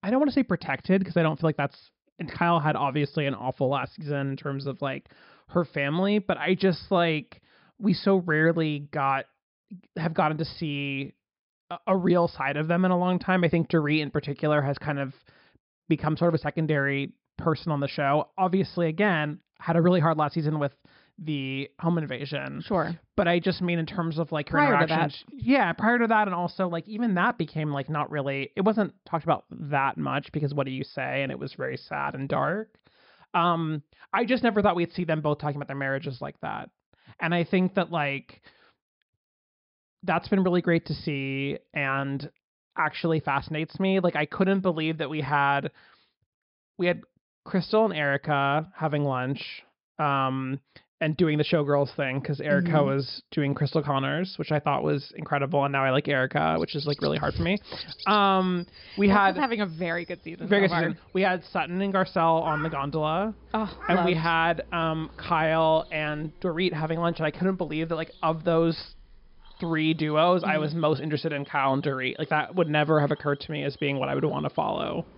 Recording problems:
high frequencies cut off; noticeable; nothing above 5.5 kHz
animal sounds; noticeable; from 57 s on; 15 dB below the speech

